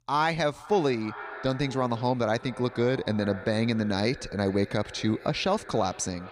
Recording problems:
echo of what is said; noticeable; throughout; 440 ms later, 15 dB below the speech

